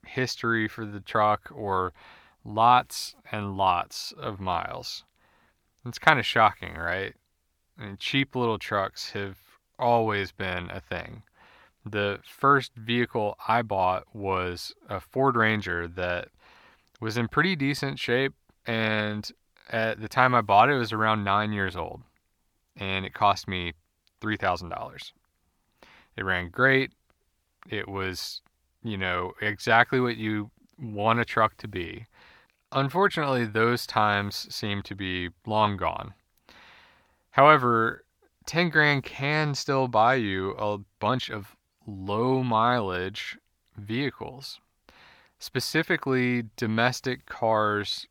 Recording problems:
uneven, jittery; strongly; from 4 to 43 s

